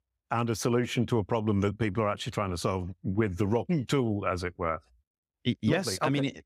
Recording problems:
none

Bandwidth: 15.5 kHz